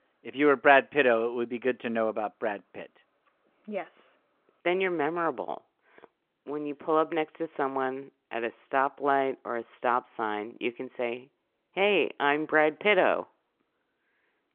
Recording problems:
phone-call audio

